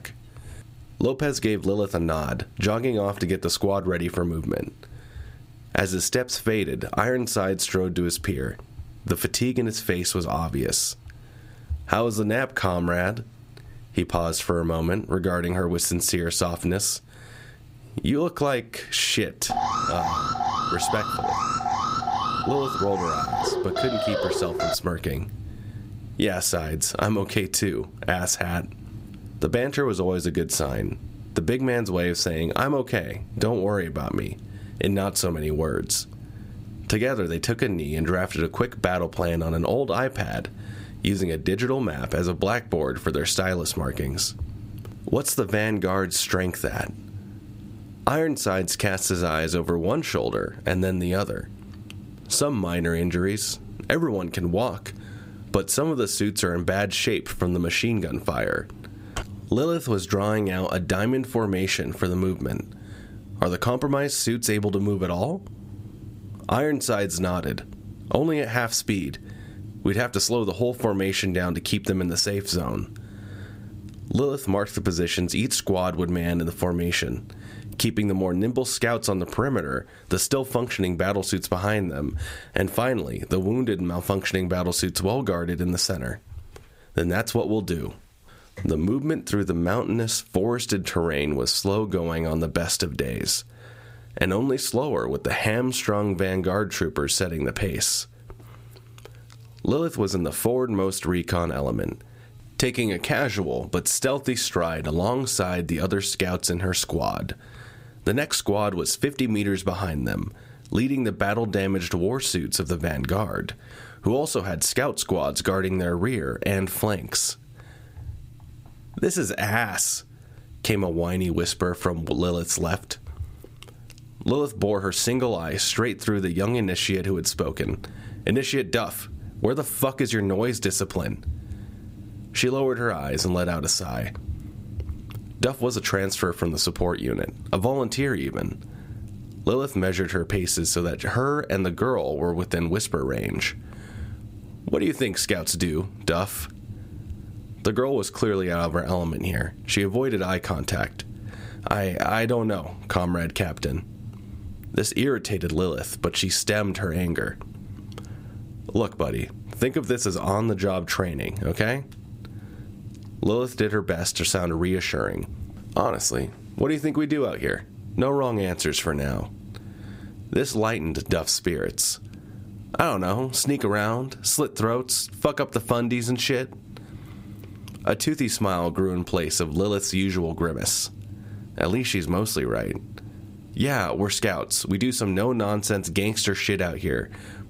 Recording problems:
squashed, flat; somewhat
alarm; loud; from 19 to 25 s; peak 1 dB above the speech

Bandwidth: 15.5 kHz